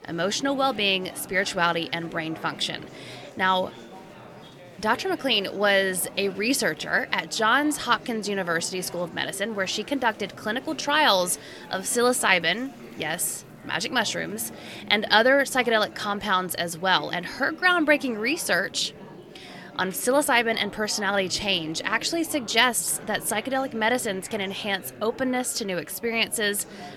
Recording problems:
murmuring crowd; noticeable; throughout; 20 dB below the speech

